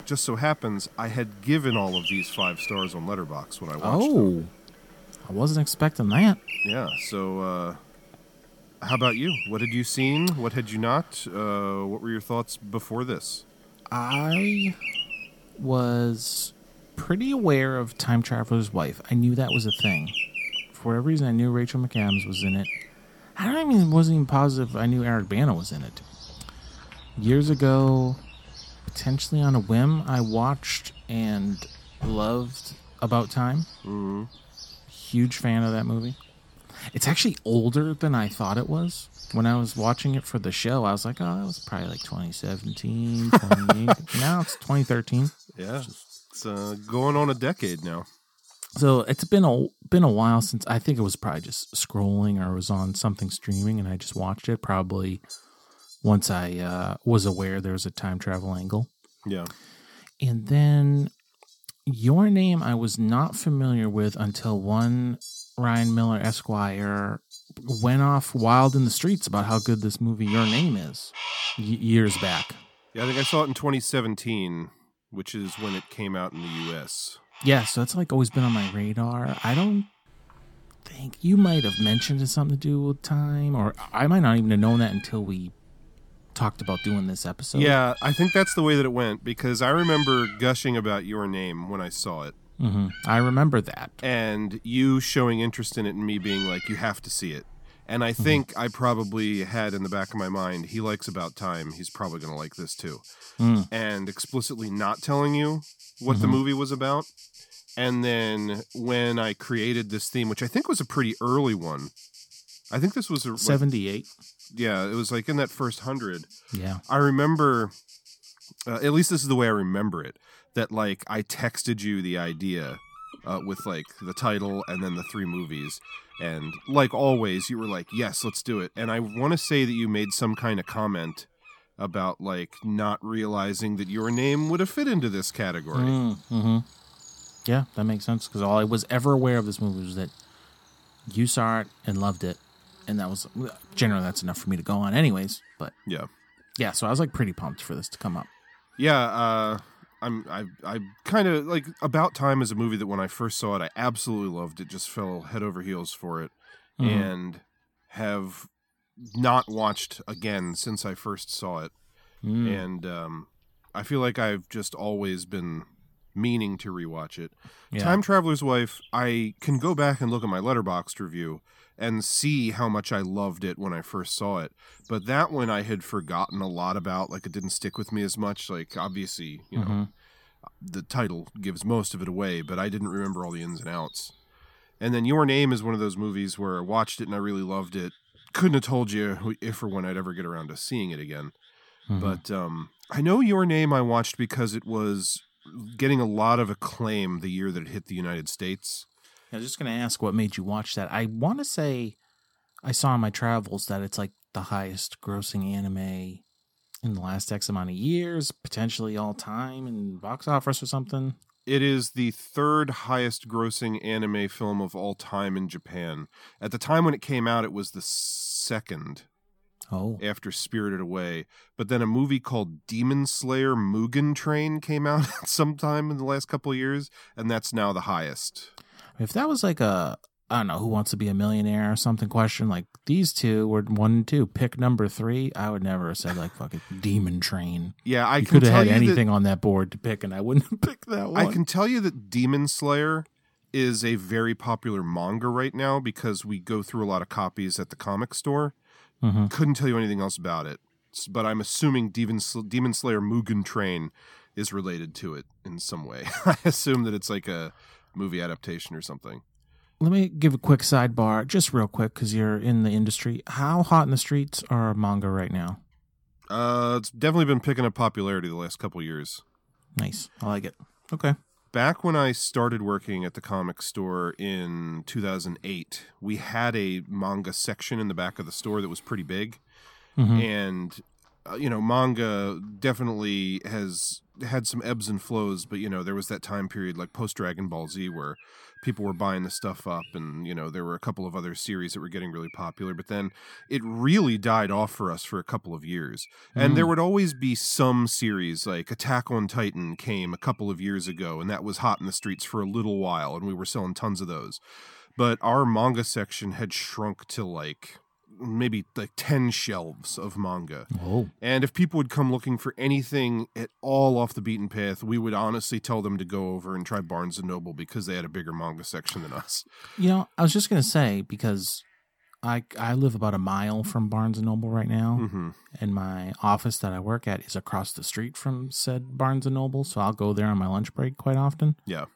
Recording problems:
animal sounds; noticeable; throughout; 10 dB below the speech

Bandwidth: 17.5 kHz